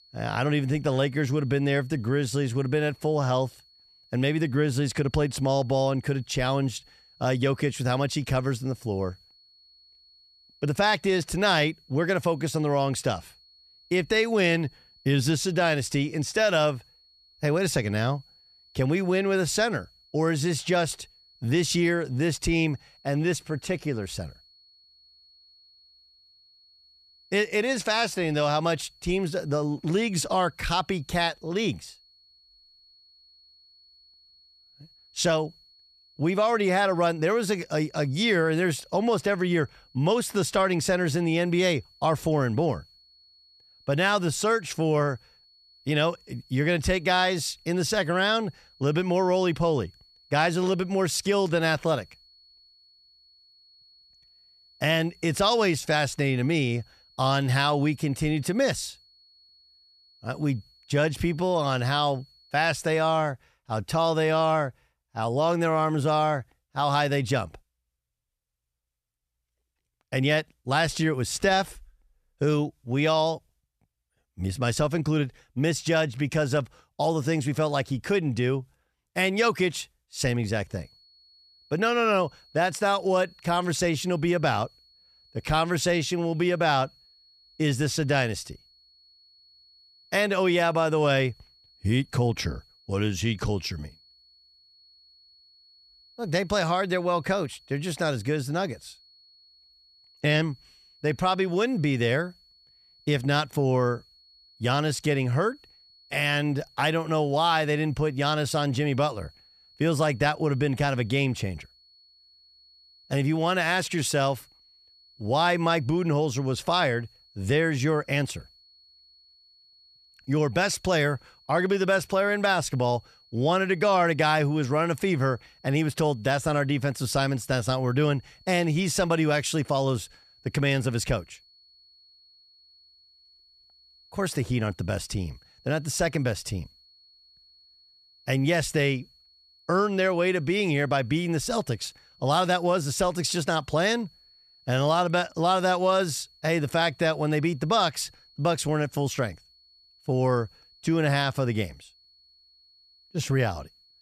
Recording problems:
high-pitched whine; faint; until 1:03 and from 1:21 on; 4.5 kHz, 30 dB below the speech

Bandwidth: 14.5 kHz